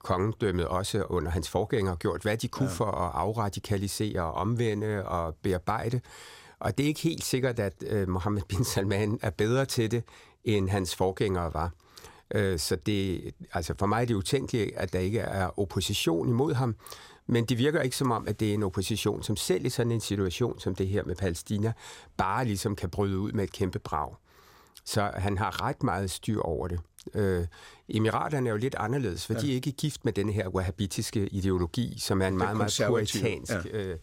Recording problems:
none

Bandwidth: 16 kHz